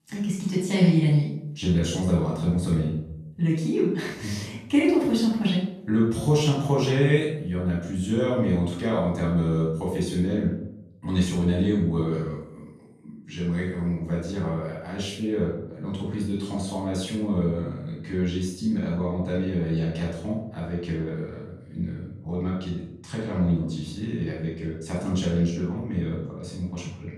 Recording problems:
off-mic speech; far
room echo; noticeable; dies away in 0.7 s

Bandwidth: 14 kHz